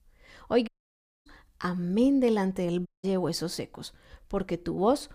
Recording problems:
audio cutting out; at 0.5 s for 0.5 s and at 3 s

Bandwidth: 15 kHz